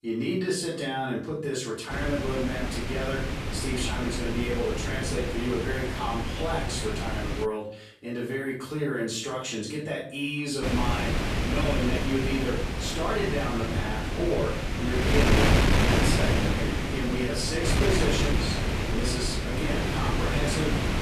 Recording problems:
off-mic speech; far
room echo; noticeable; dies away in 0.5 s
wind noise on the microphone; heavy; from 2 to 7.5 s and from 11 s on; 1 dB above the speech

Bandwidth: 14 kHz